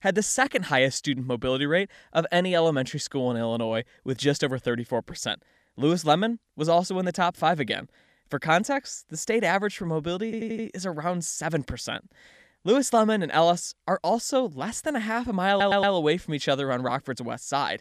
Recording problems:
audio stuttering; at 10 s and at 15 s

